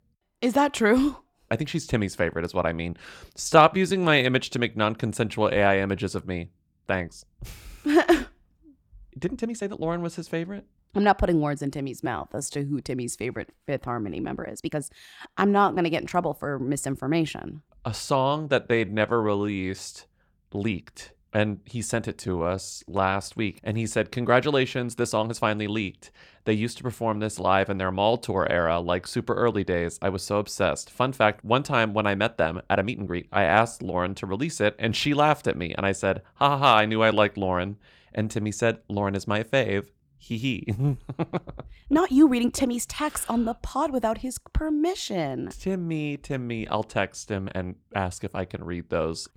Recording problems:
uneven, jittery; strongly; from 3.5 to 48 s

